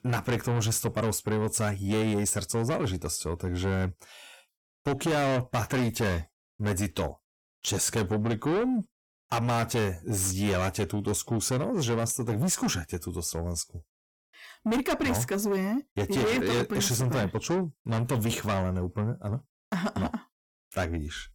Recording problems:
distortion; heavy; 6 dB below the speech

